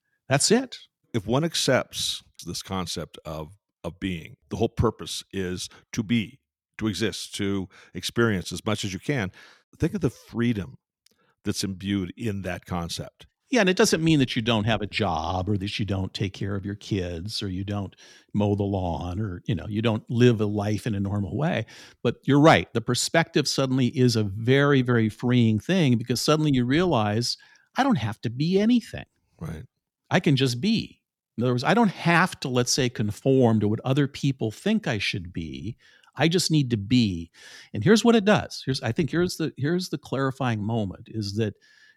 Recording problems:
none

